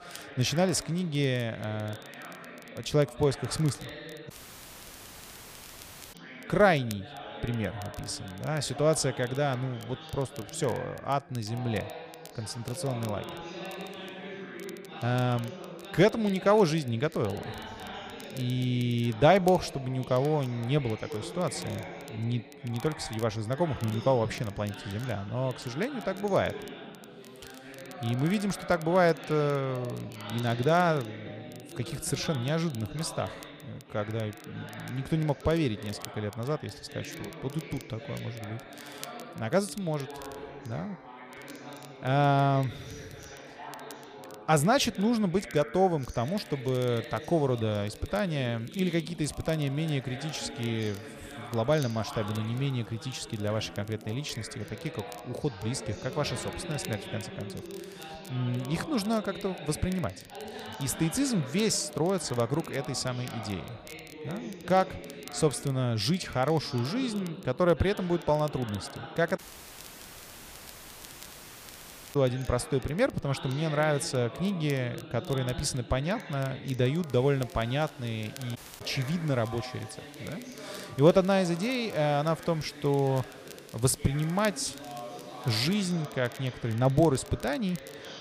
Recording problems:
background chatter; noticeable; throughout; 3 voices, 15 dB below the speech
rain or running water; faint; from 46 s on; 25 dB below the speech
crackle, like an old record; faint; 25 dB below the speech
audio cutting out; at 4.5 s for 2 s, at 1:09 for 3 s and at 1:19

